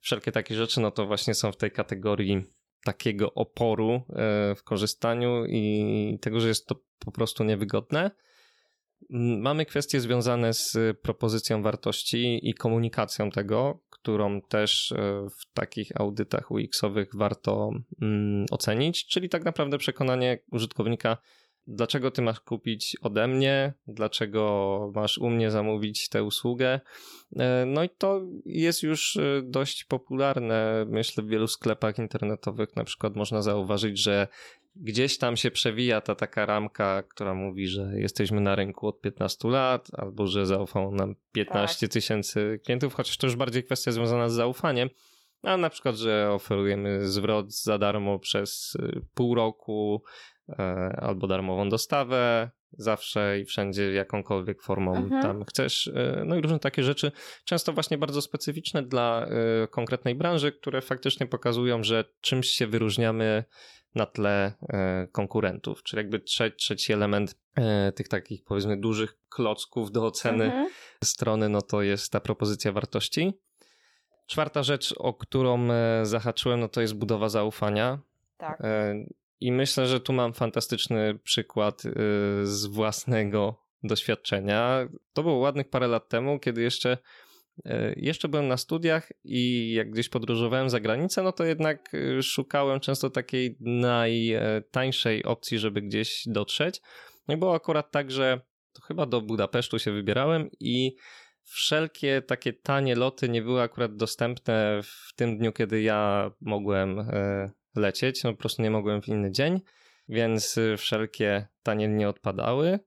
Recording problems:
none

